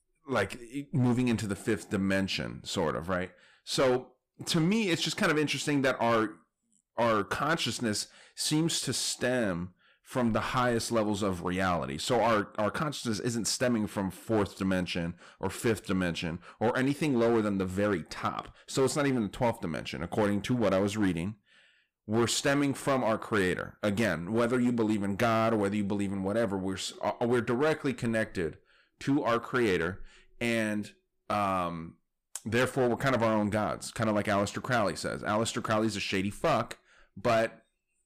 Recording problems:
distortion; slight; 6% of the sound clipped

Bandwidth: 15 kHz